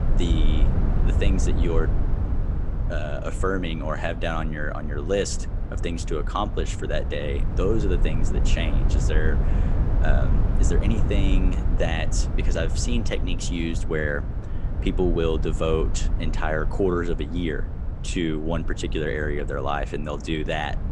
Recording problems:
low rumble; loud; throughout; 10 dB below the speech

